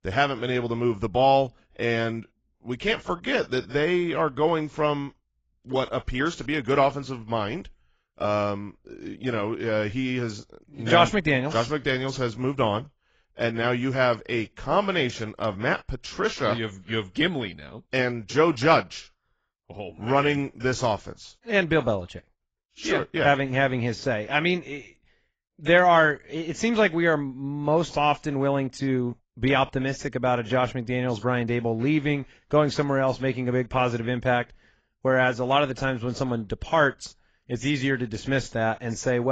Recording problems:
garbled, watery; badly; nothing above 7.5 kHz
abrupt cut into speech; at the end

